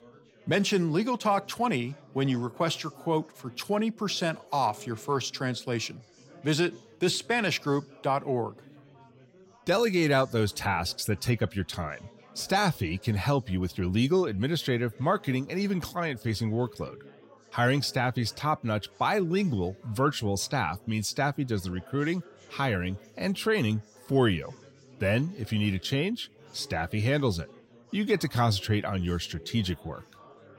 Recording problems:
chatter from many people; faint; throughout; 25 dB below the speech

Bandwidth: 16 kHz